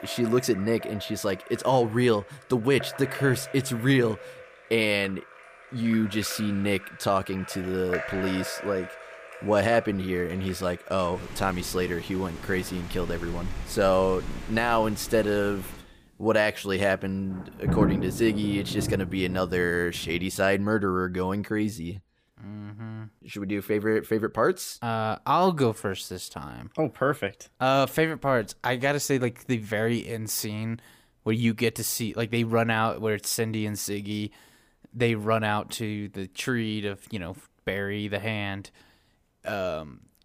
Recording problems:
rain or running water; noticeable; until 20 s; 10 dB below the speech

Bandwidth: 15 kHz